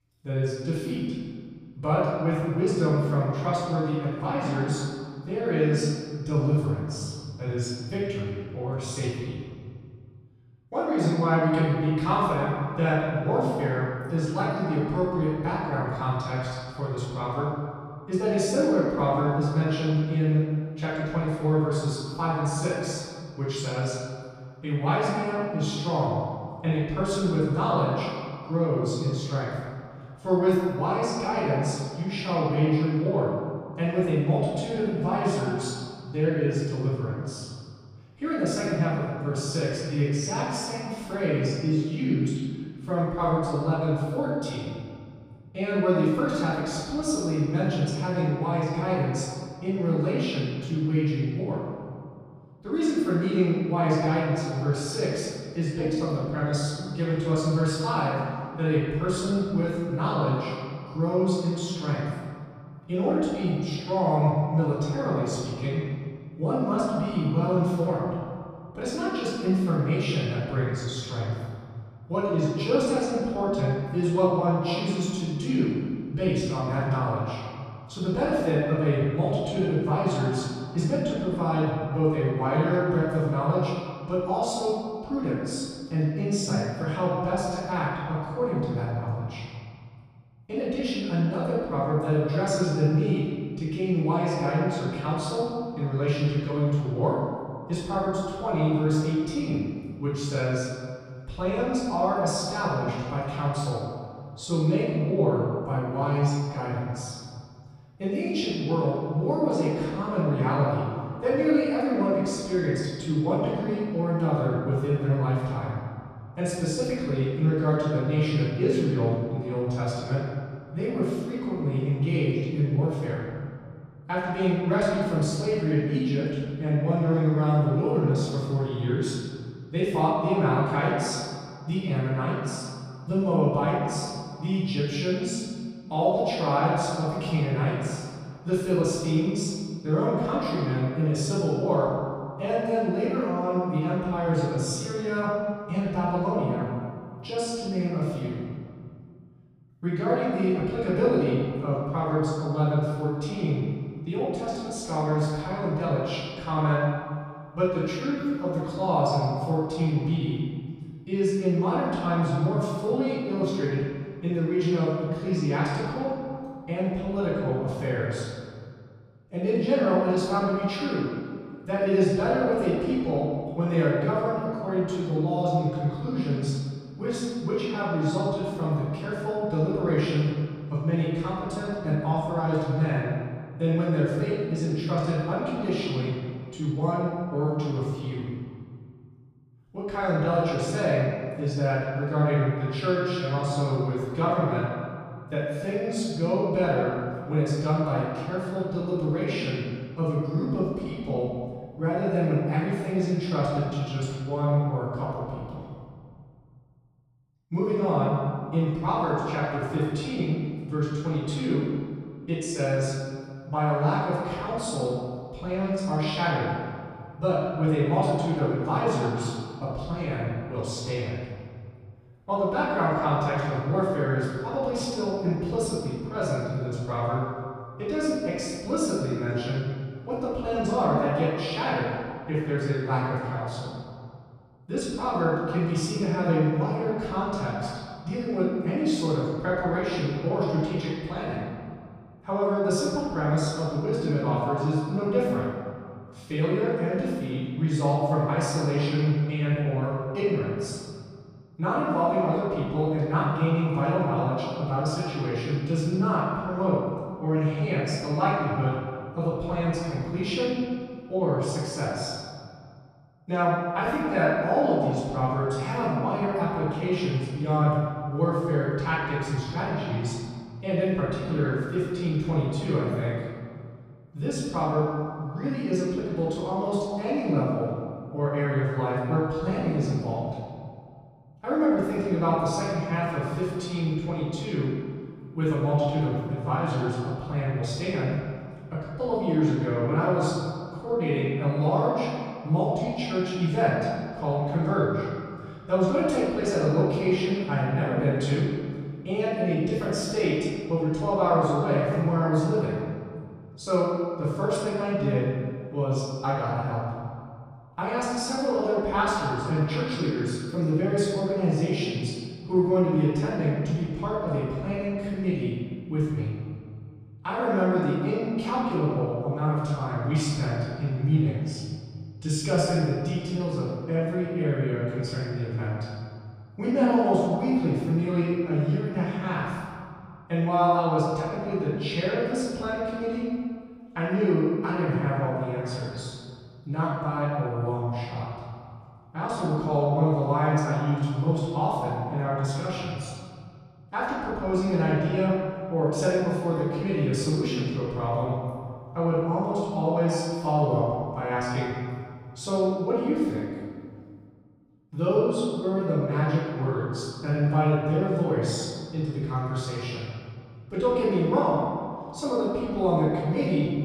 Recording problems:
room echo; strong; dies away in 2 s
off-mic speech; far

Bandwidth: 15 kHz